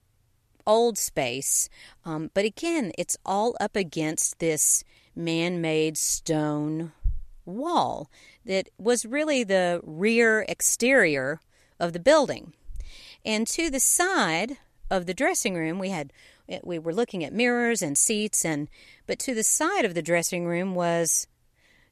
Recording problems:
none

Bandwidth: 14 kHz